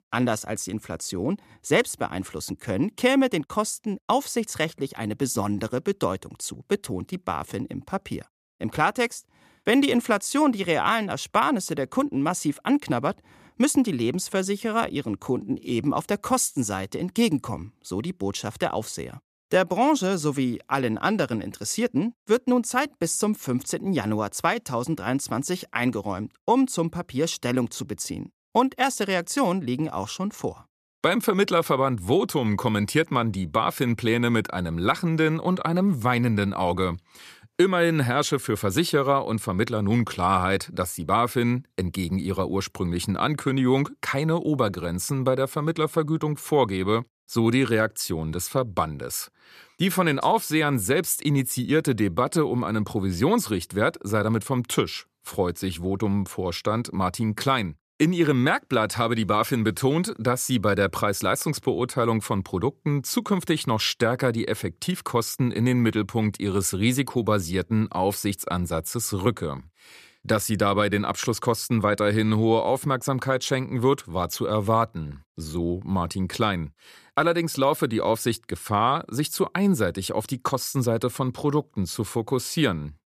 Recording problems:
none

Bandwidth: 14.5 kHz